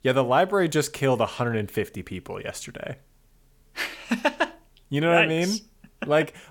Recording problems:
none

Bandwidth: 17.5 kHz